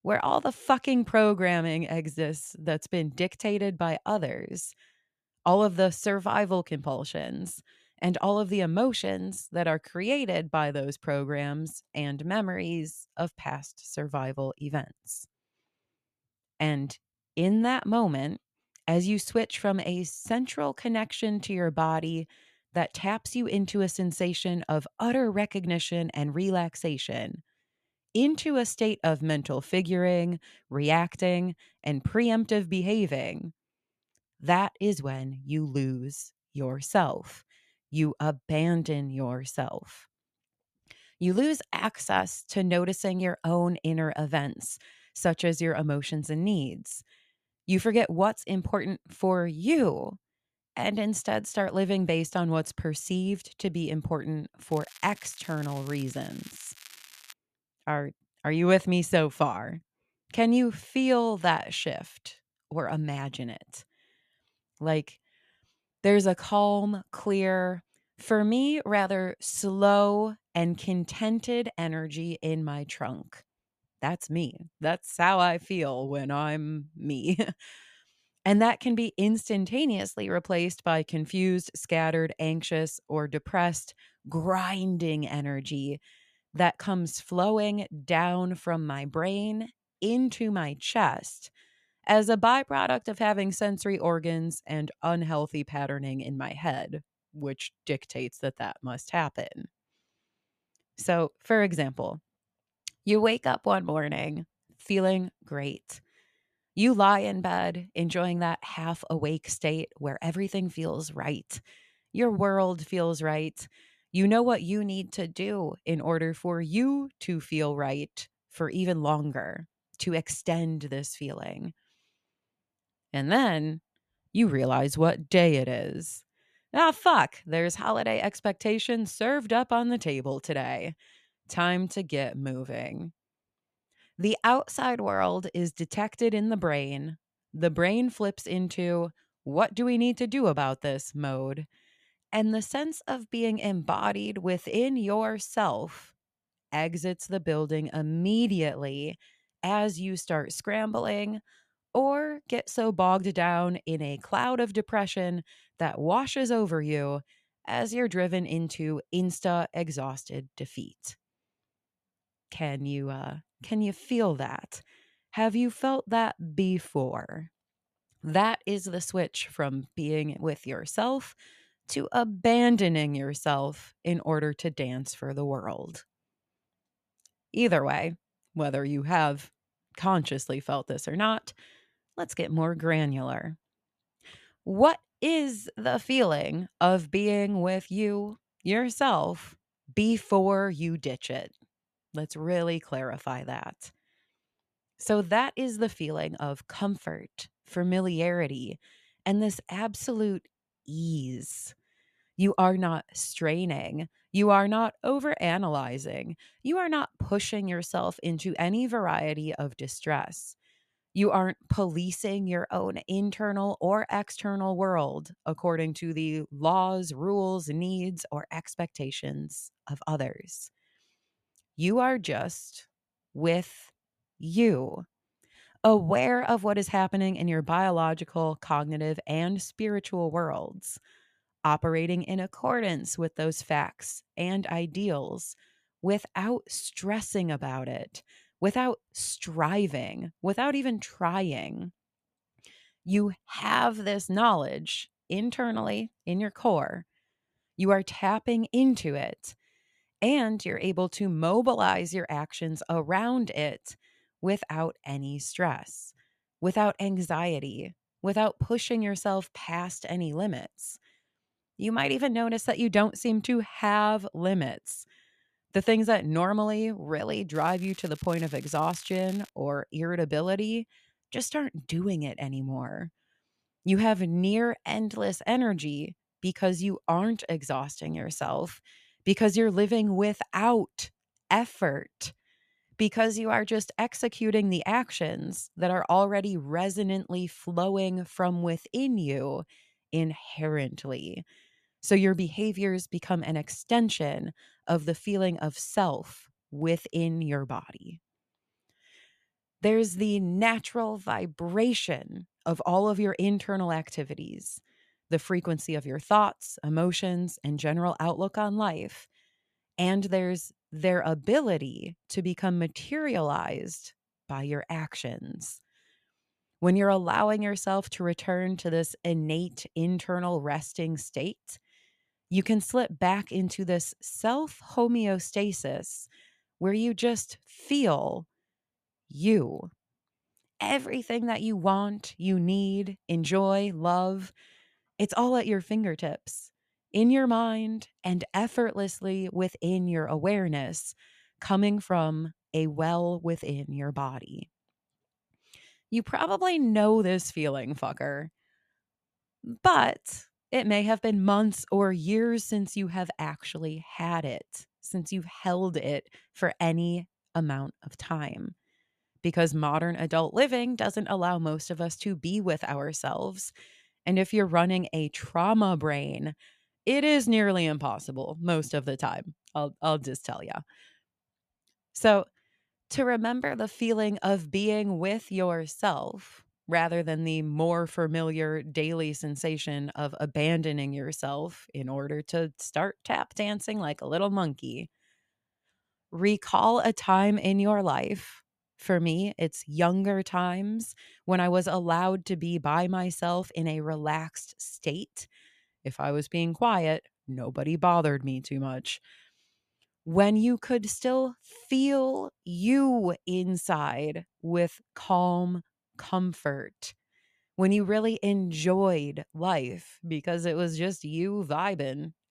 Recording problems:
crackling; faint; from 55 to 57 s and from 4:28 to 4:29; 20 dB below the speech

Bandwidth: 14.5 kHz